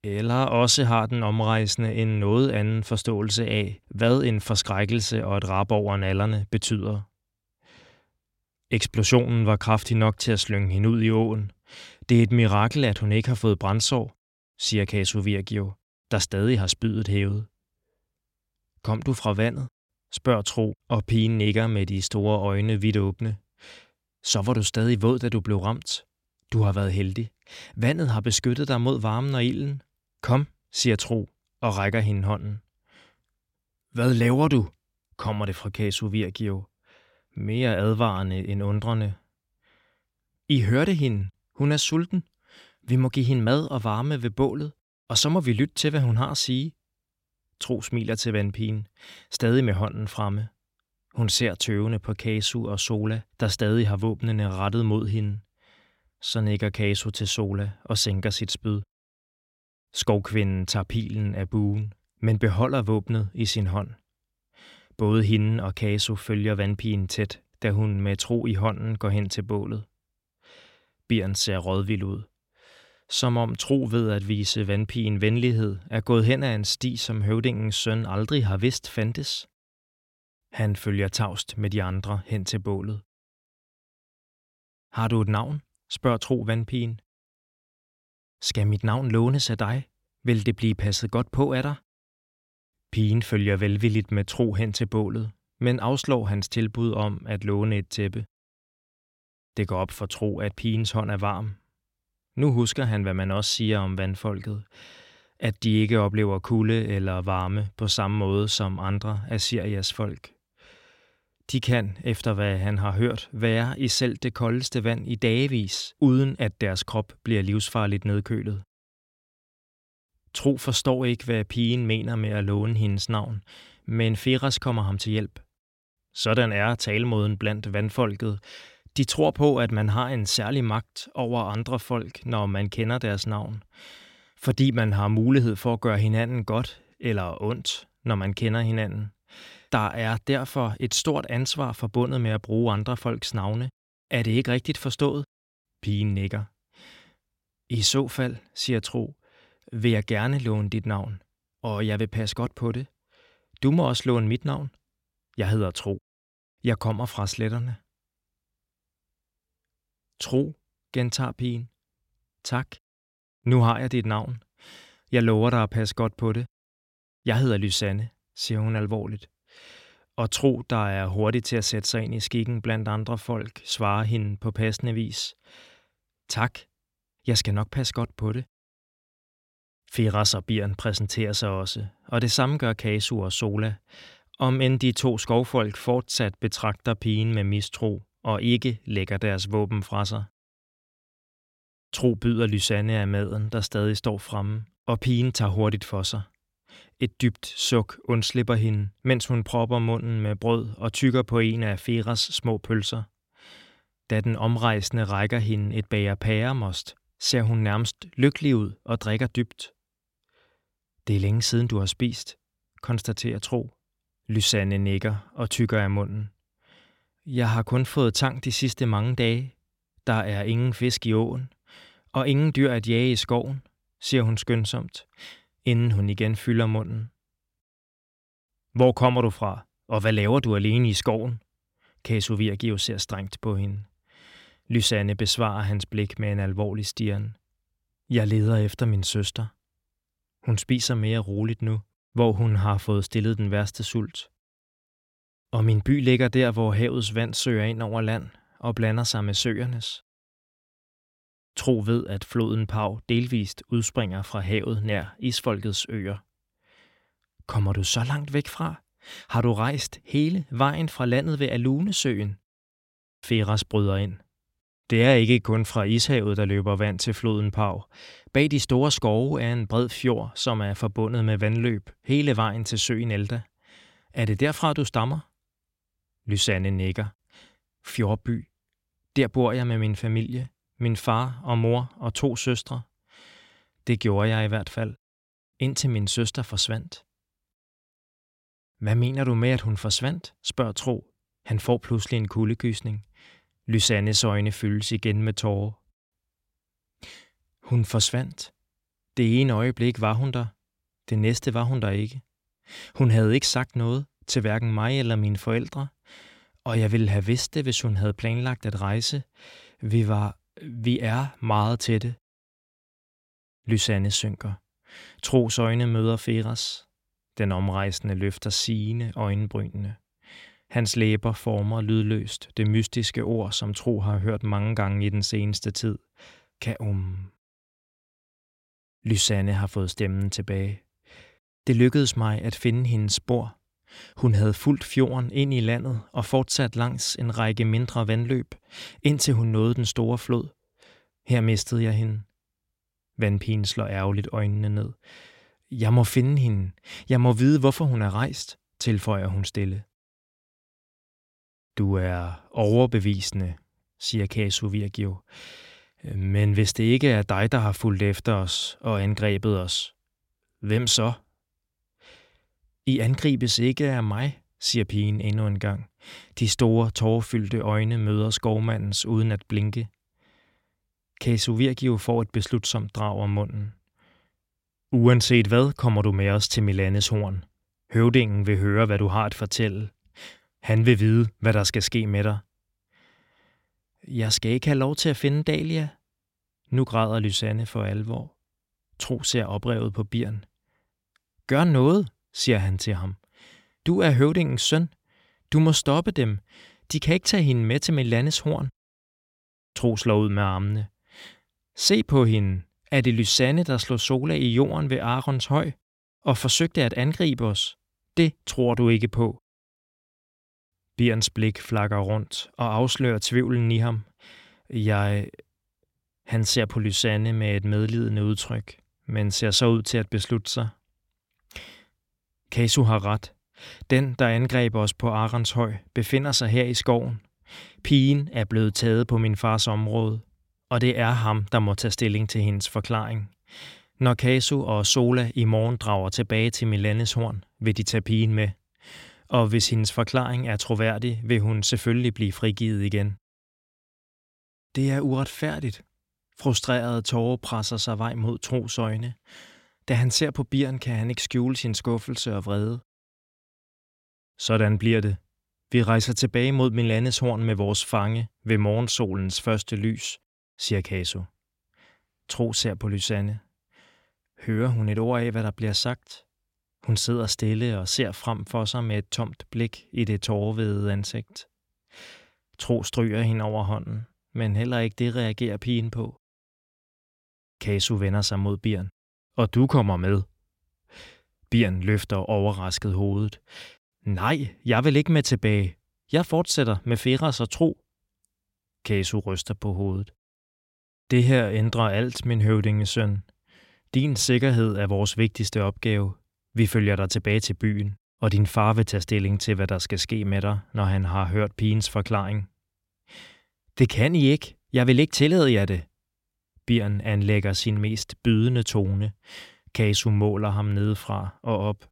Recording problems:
none

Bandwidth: 16.5 kHz